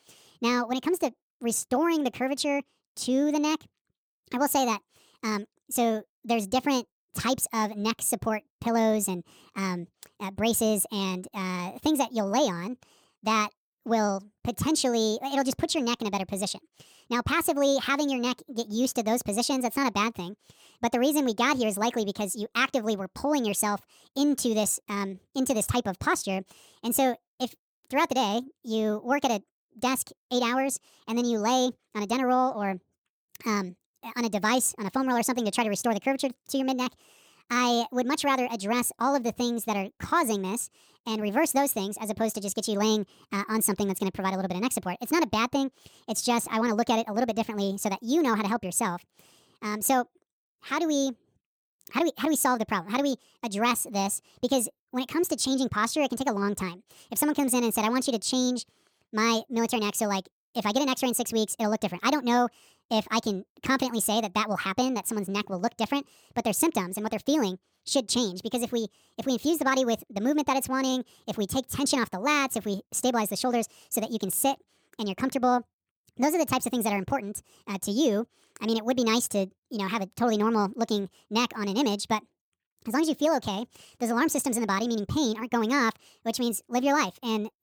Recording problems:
wrong speed and pitch; too fast and too high; 1.5 times normal speed

